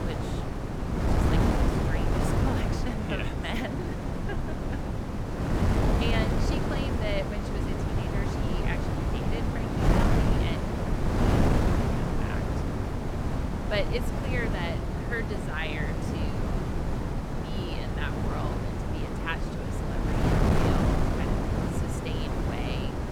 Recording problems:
wind noise on the microphone; heavy; 3 dB above the speech

